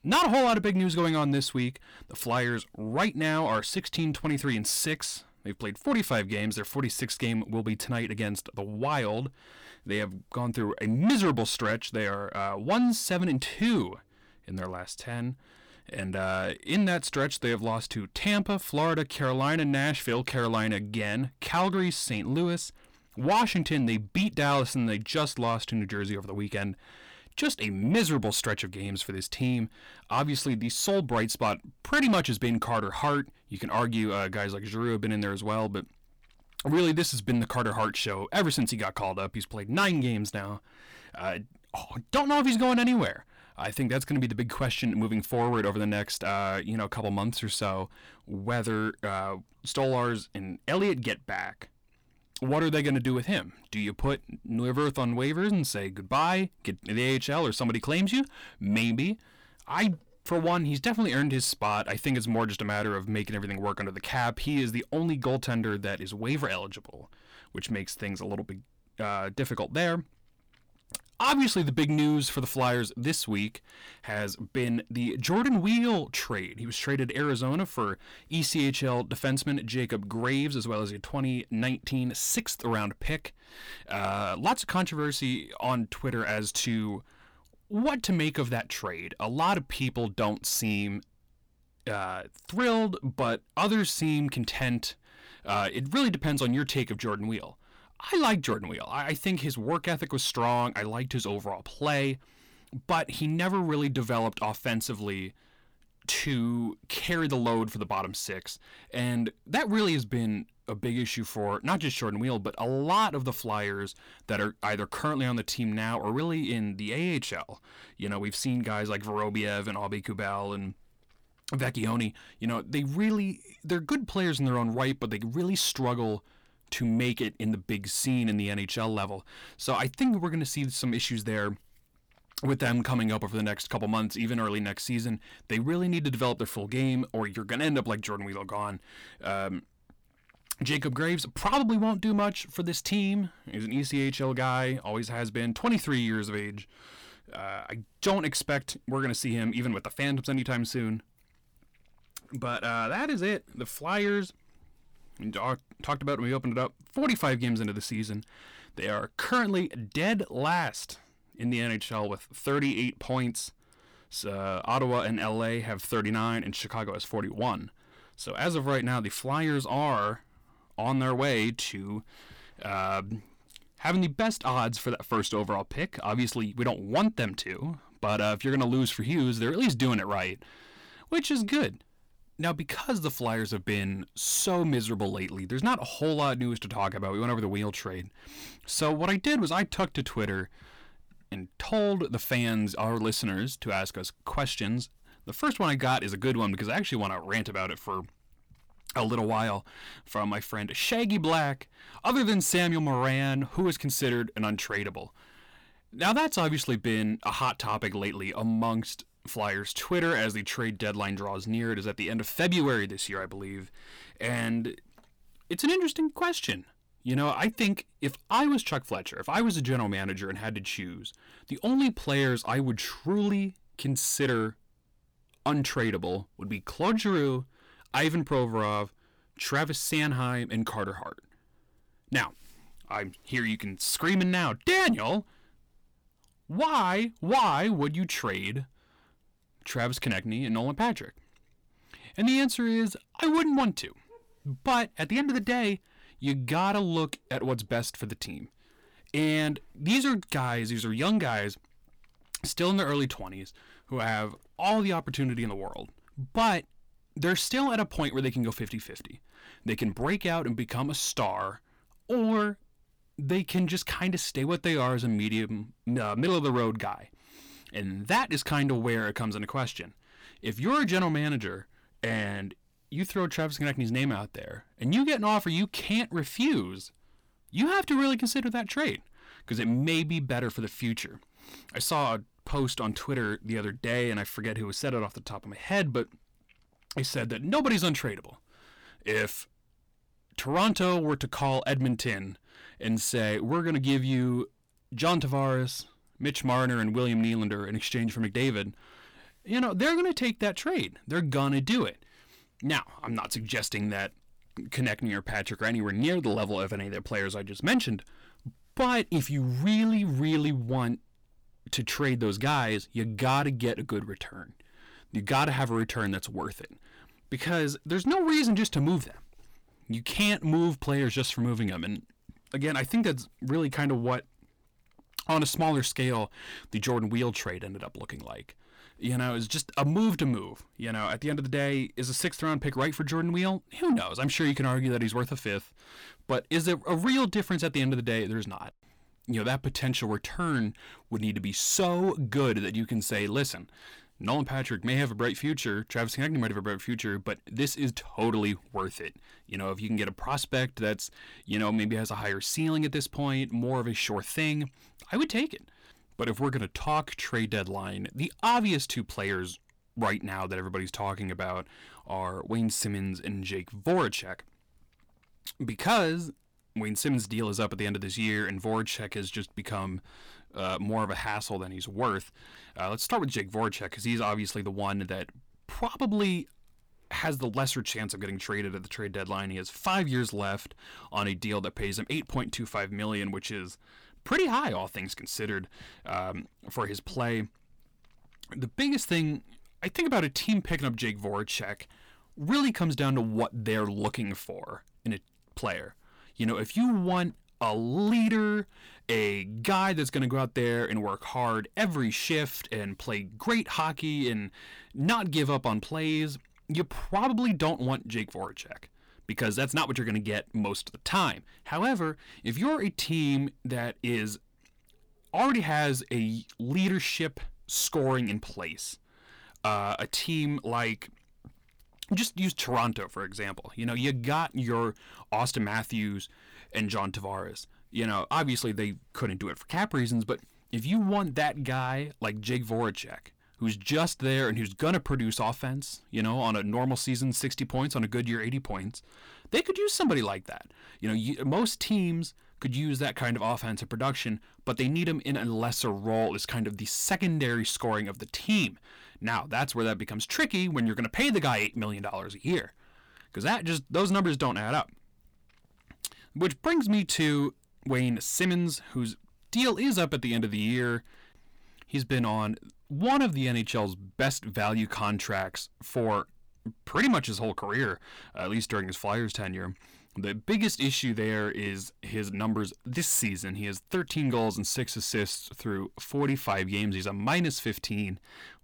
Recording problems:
distortion; slight; 10 dB below the speech

